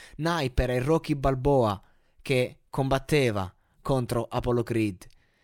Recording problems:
none

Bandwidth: 17.5 kHz